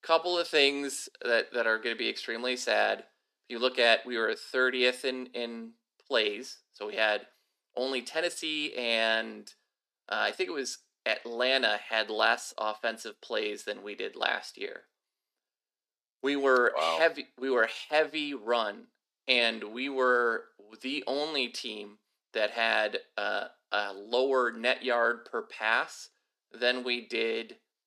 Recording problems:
thin; somewhat; fading below 300 Hz

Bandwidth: 14 kHz